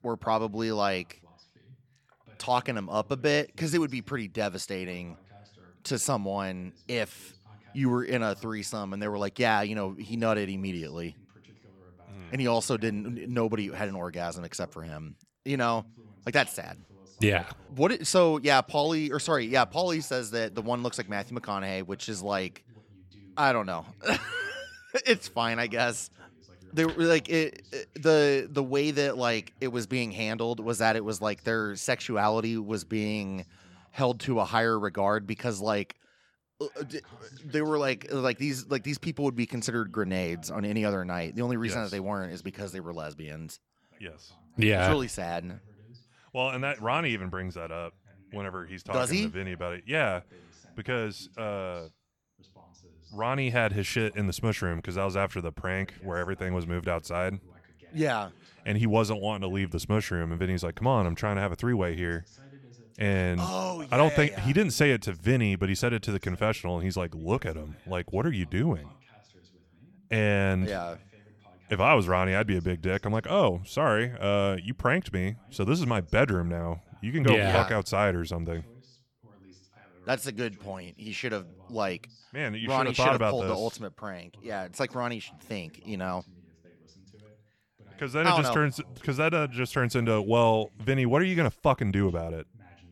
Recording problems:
voice in the background; faint; throughout; 30 dB below the speech

